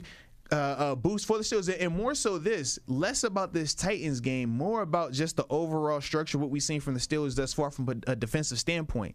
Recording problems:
squashed, flat; somewhat

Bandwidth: 14.5 kHz